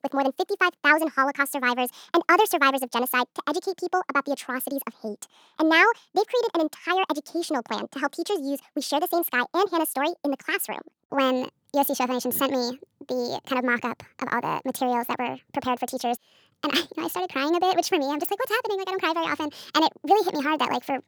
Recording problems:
wrong speed and pitch; too fast and too high; 1.6 times normal speed

